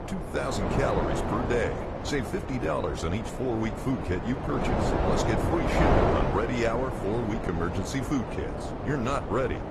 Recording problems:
garbled, watery; slightly; nothing above 15.5 kHz
wind noise on the microphone; heavy; 1 dB above the speech

